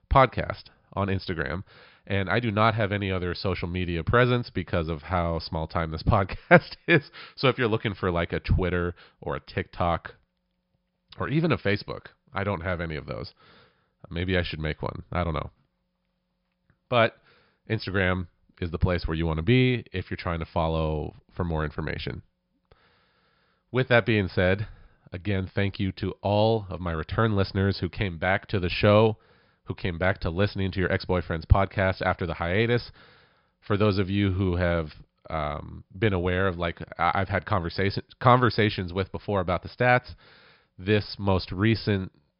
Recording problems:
high frequencies cut off; noticeable; nothing above 5.5 kHz

